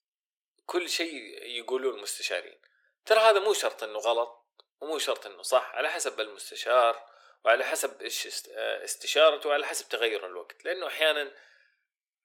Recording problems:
thin; very; fading below 400 Hz

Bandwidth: 18 kHz